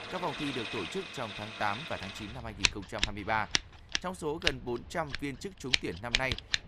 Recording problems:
household noises; very loud; throughout; 3 dB above the speech

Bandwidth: 15 kHz